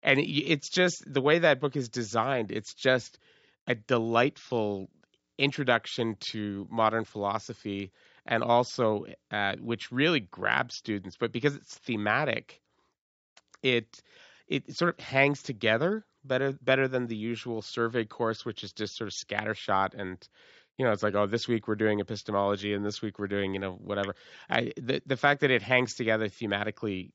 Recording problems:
high frequencies cut off; noticeable; nothing above 8 kHz

